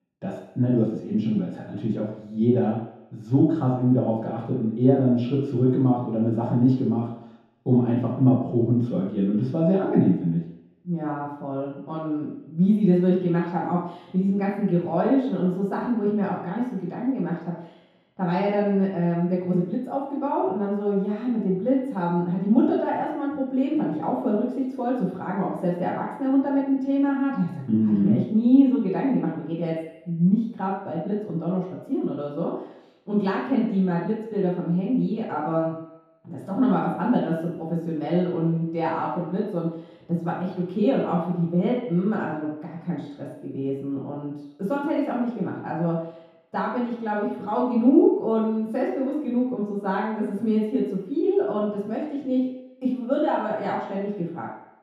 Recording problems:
room echo; strong; dies away in 0.8 s
off-mic speech; far

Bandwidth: 14.5 kHz